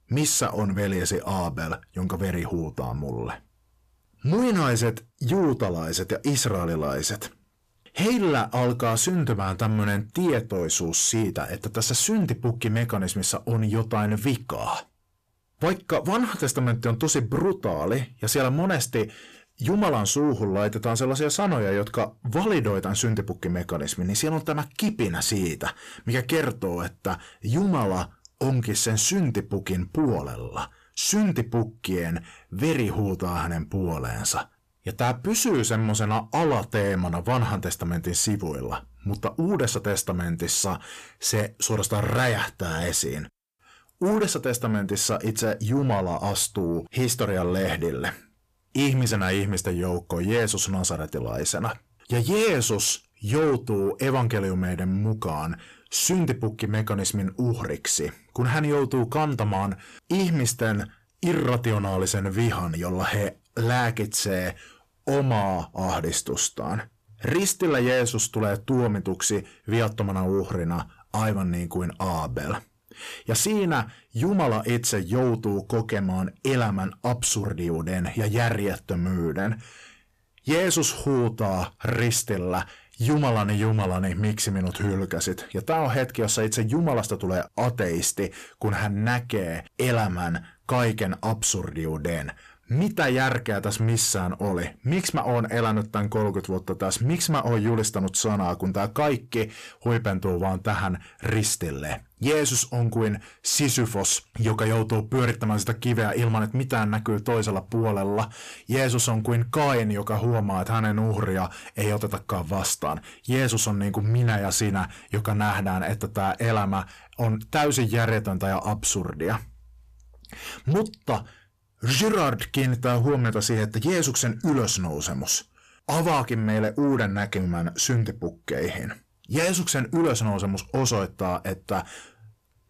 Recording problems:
distortion; slight; 10 dB below the speech

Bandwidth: 14.5 kHz